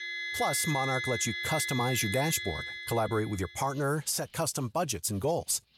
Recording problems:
background music; loud; throughout; 3 dB below the speech

